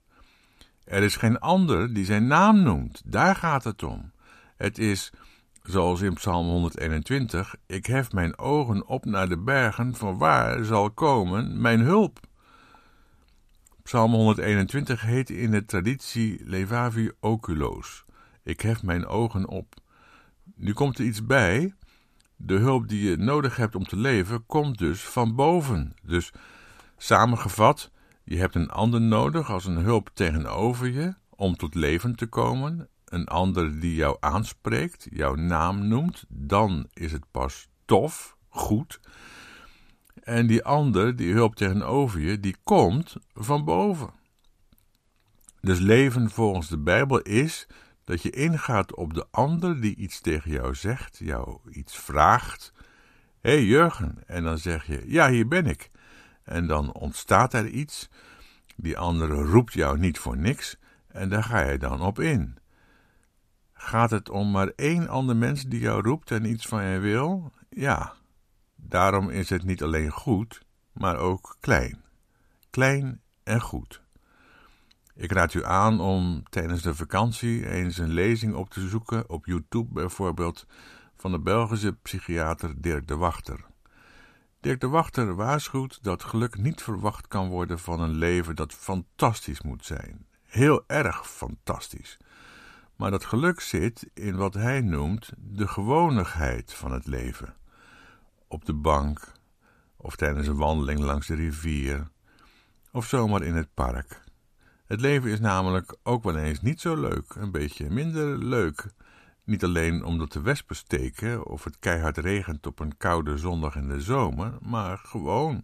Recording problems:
none

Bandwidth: 14.5 kHz